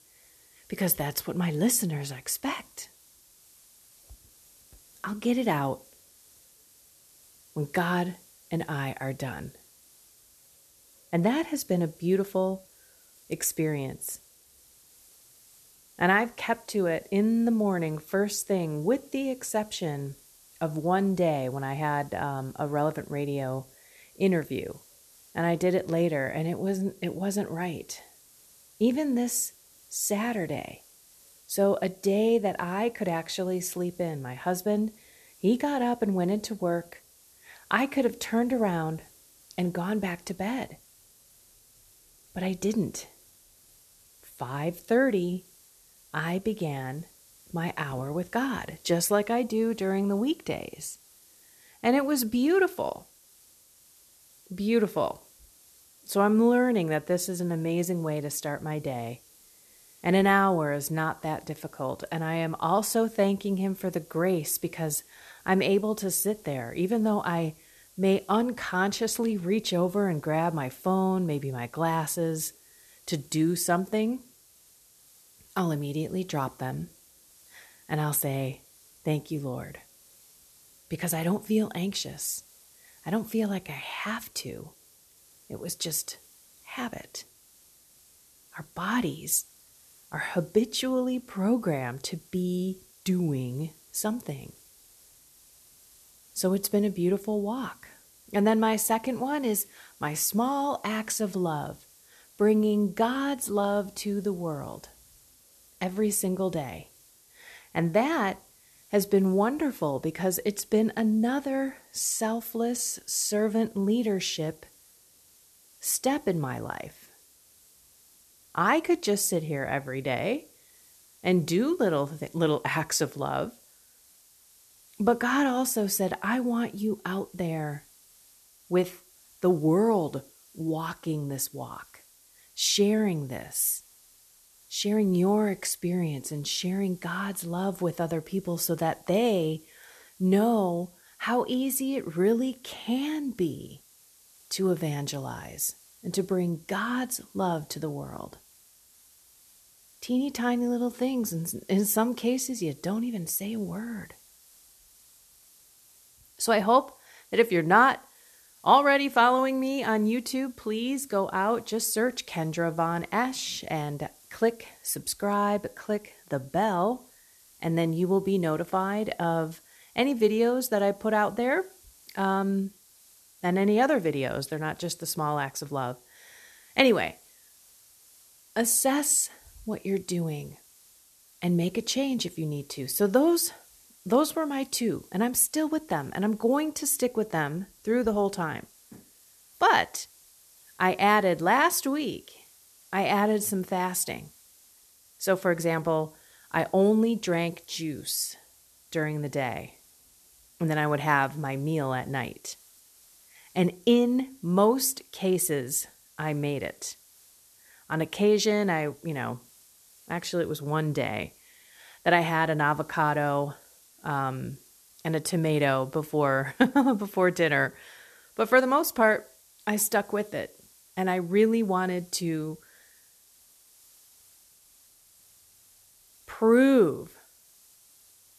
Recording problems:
hiss; faint; throughout; 25 dB below the speech

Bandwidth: 13.5 kHz